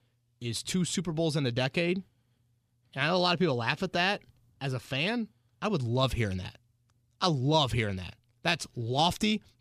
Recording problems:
none

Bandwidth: 15 kHz